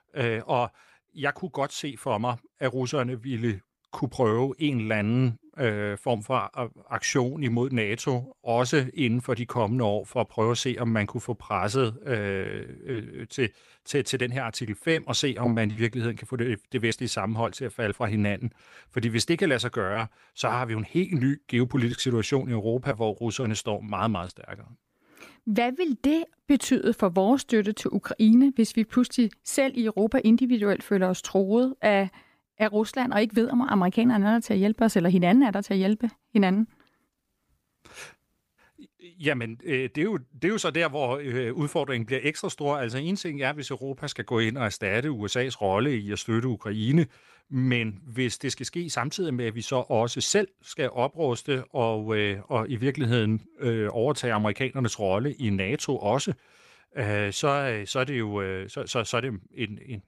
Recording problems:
none

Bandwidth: 15 kHz